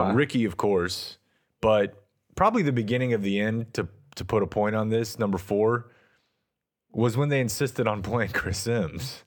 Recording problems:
abrupt cut into speech; at the start

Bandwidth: 19 kHz